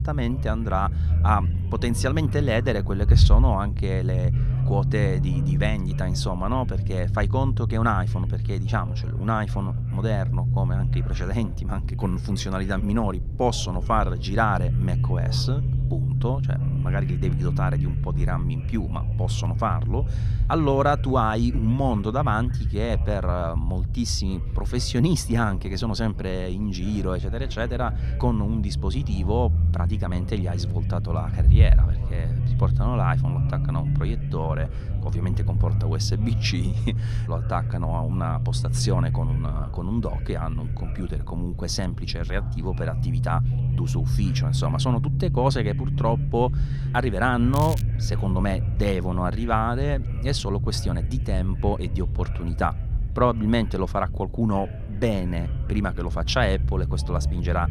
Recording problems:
low rumble; noticeable; throughout; 10 dB below the speech
crackling; noticeable; at 48 s; 15 dB below the speech
background chatter; faint; throughout; 3 voices, 25 dB below the speech

